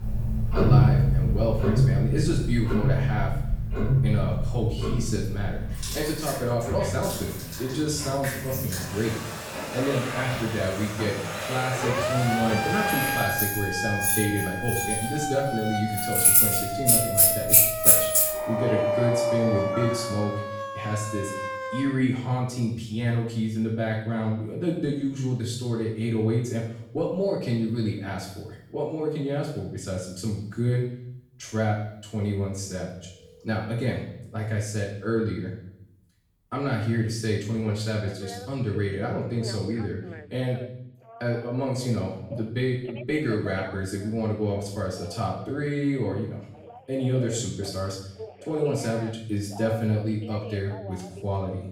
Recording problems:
off-mic speech; far
room echo; noticeable; dies away in 0.7 s
household noises; very loud; until 20 s; 5 dB above the speech
alarms or sirens; loud; throughout; 3 dB below the speech

